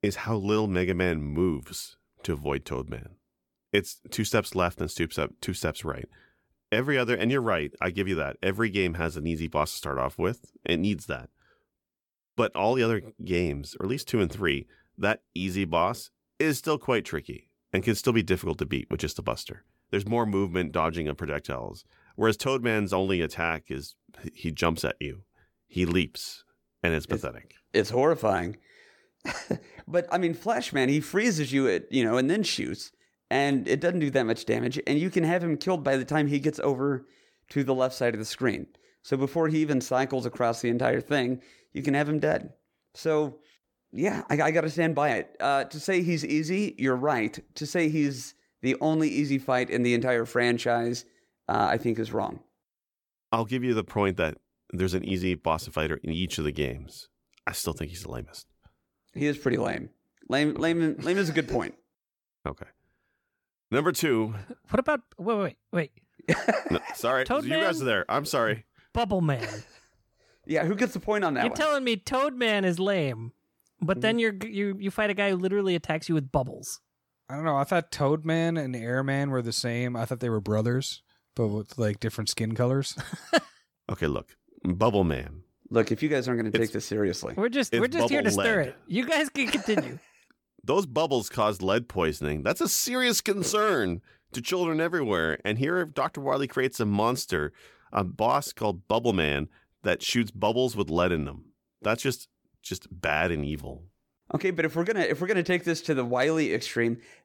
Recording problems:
none

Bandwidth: 18 kHz